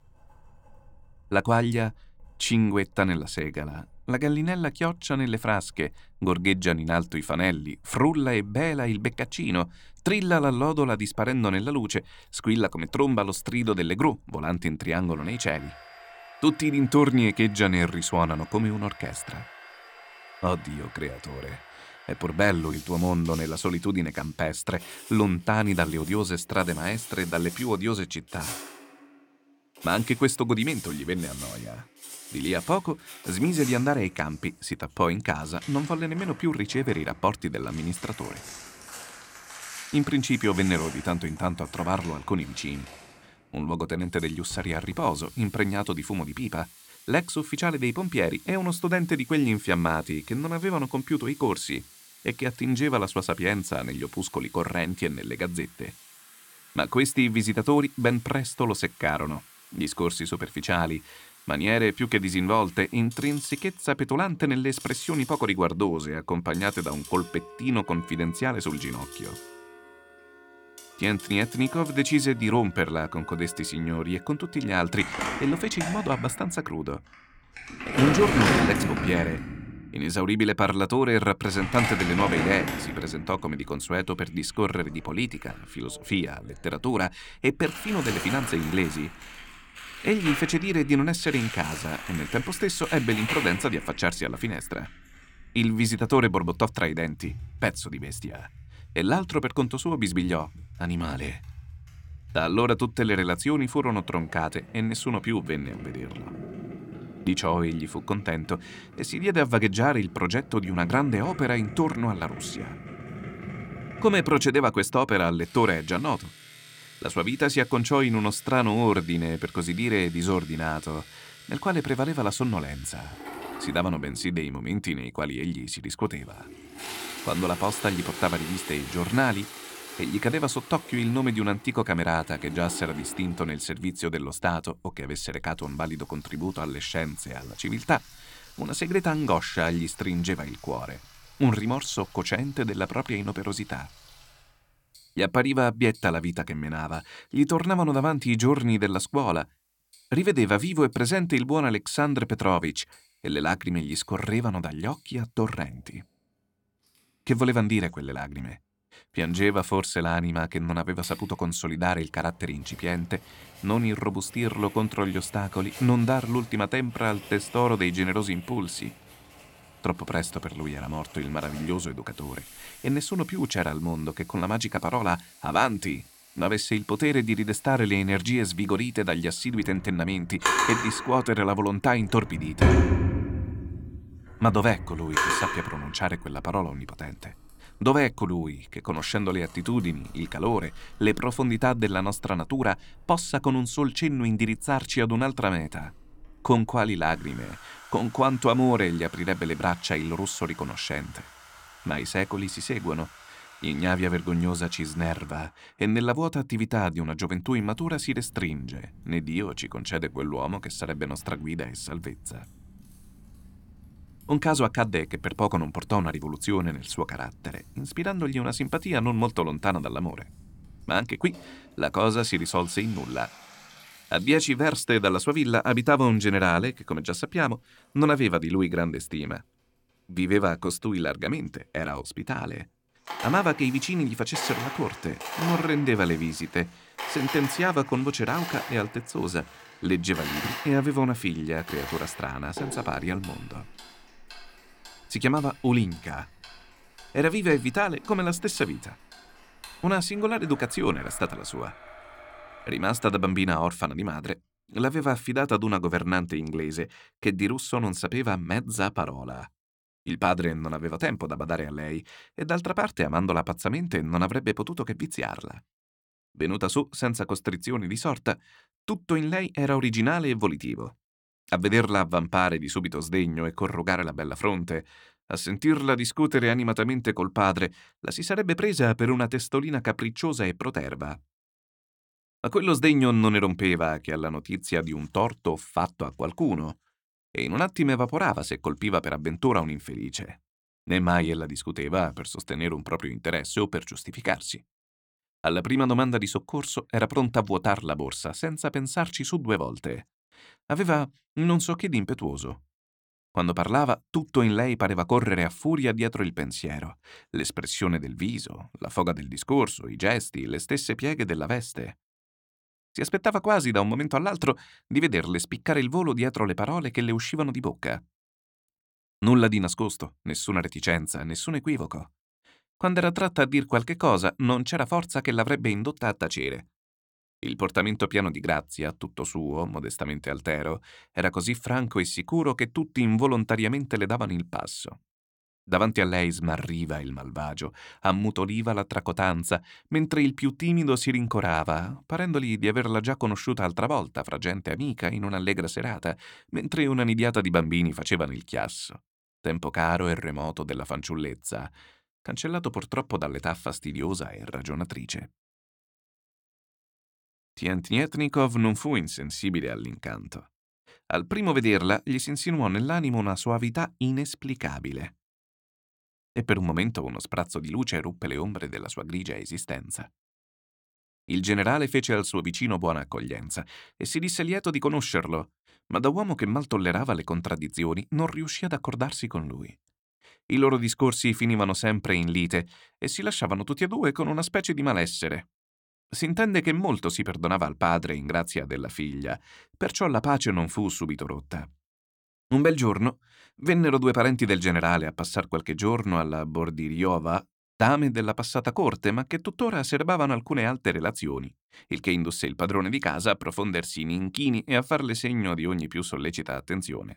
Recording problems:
household noises; noticeable; until 4:13; 10 dB below the speech

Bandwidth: 17 kHz